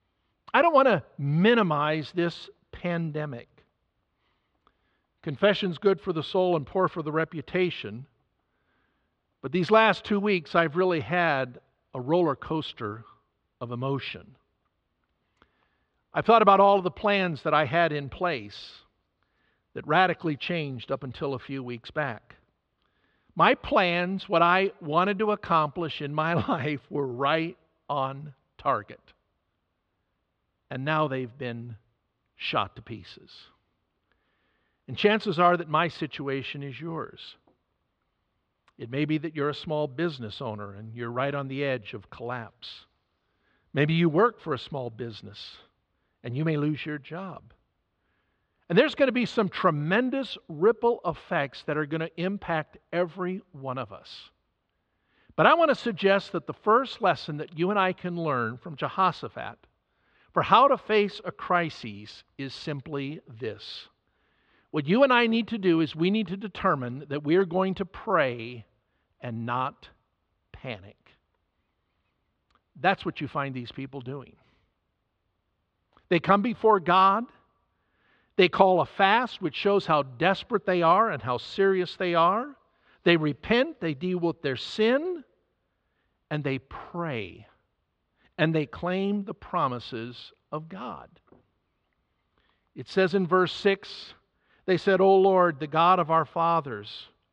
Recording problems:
muffled; slightly; fading above 3.5 kHz

